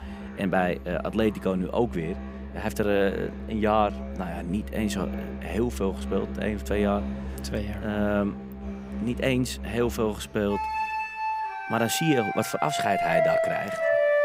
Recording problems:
background music; loud; throughout; 4 dB below the speech

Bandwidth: 15.5 kHz